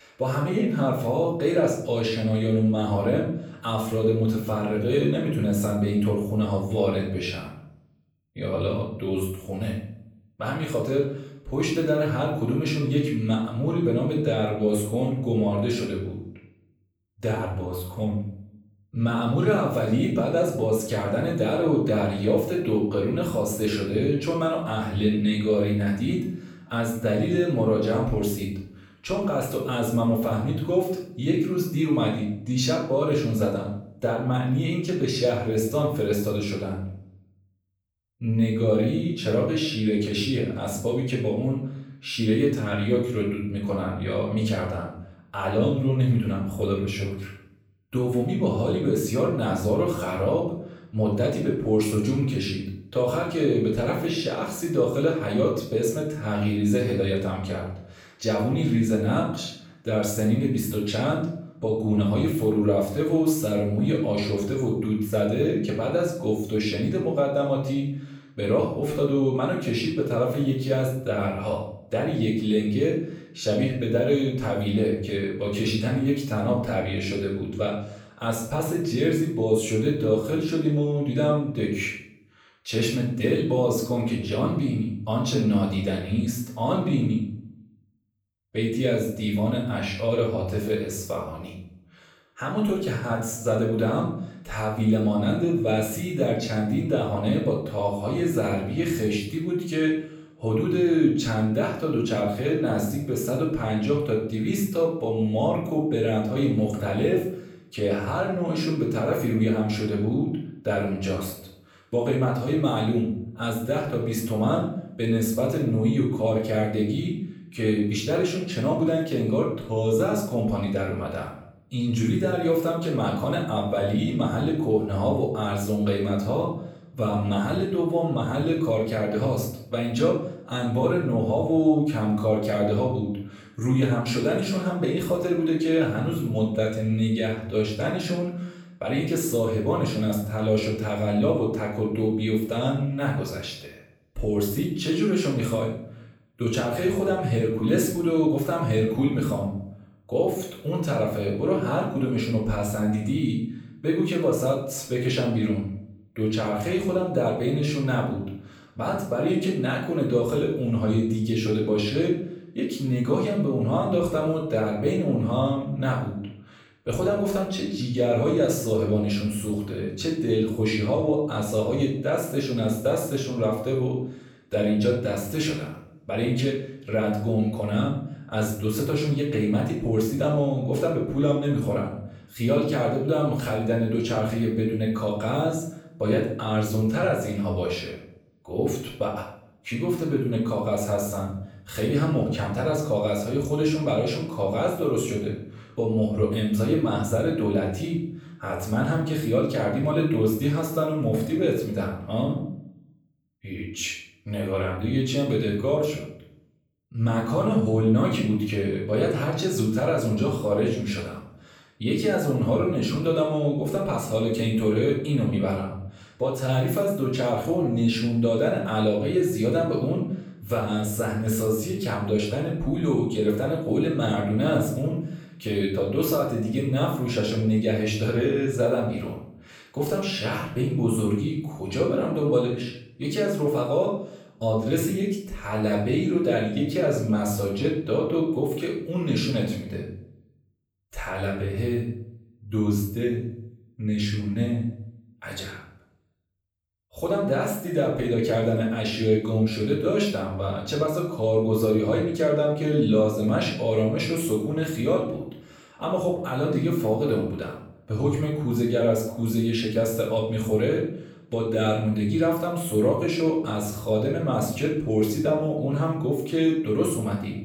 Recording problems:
off-mic speech; far
room echo; noticeable; dies away in 0.6 s

